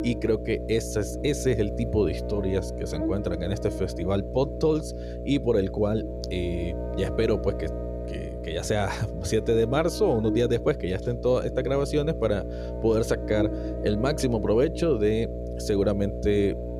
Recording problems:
electrical hum; loud; throughout; 60 Hz, 8 dB below the speech

